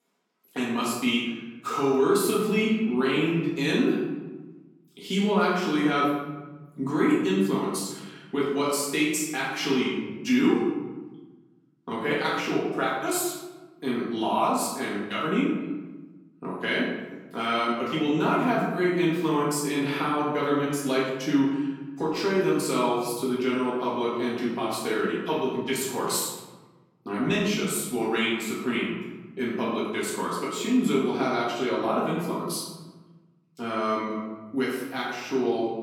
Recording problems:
off-mic speech; far
room echo; noticeable; dies away in 1.2 s

